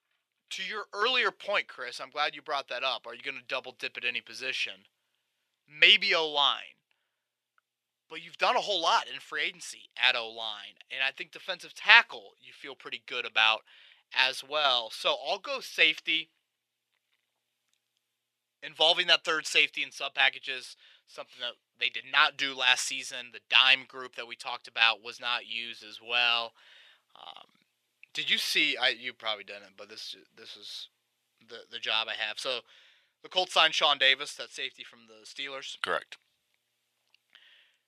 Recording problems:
thin; very; fading below 650 Hz

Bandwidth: 14 kHz